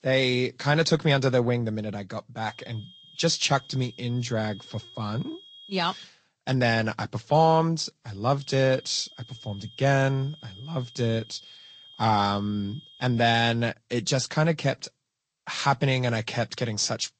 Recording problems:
garbled, watery; slightly; nothing above 7.5 kHz
high-pitched whine; faint; from 2.5 to 6 s and from 8.5 to 13 s; 3 kHz, 20 dB below the speech

